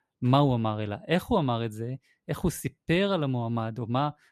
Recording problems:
none

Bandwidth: 14 kHz